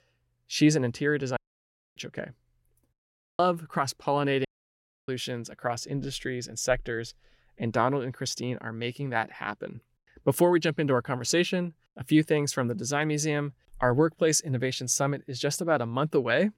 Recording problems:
audio cutting out; at 1.5 s for 0.5 s, at 3 s and at 4.5 s for 0.5 s

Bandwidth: 16.5 kHz